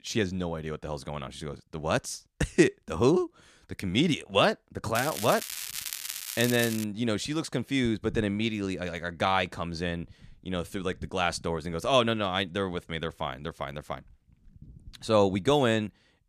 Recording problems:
crackling; loud; from 5 to 7 s; 6 dB below the speech

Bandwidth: 14.5 kHz